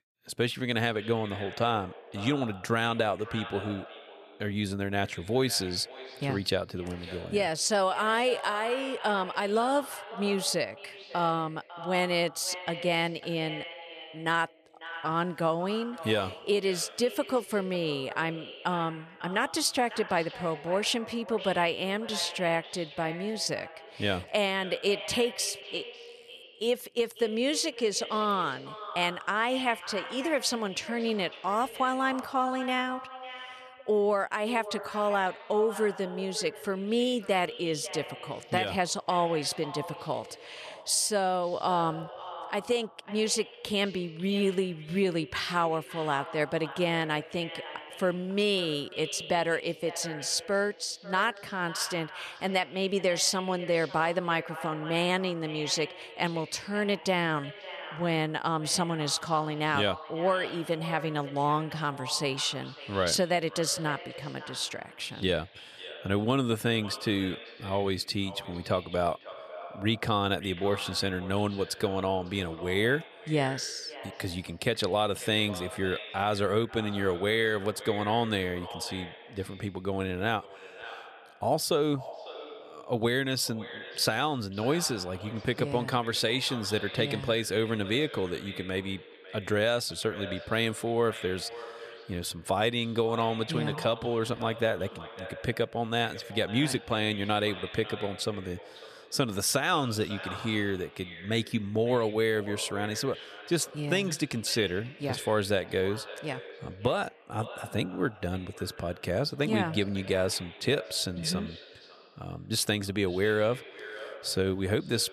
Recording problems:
echo of what is said; noticeable; throughout; 550 ms later, 15 dB below the speech

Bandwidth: 14.5 kHz